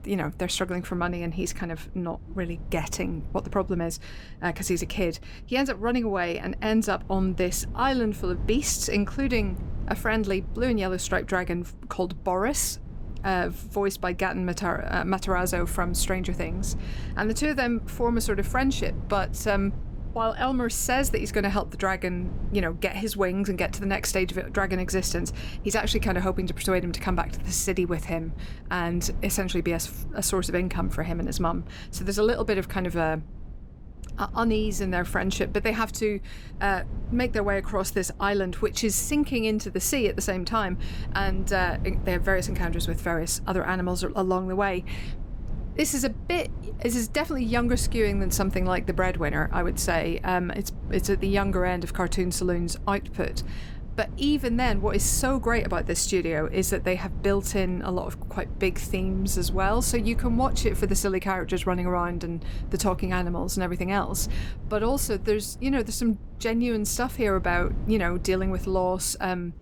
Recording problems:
low rumble; faint; throughout; 20 dB below the speech

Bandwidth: 18.5 kHz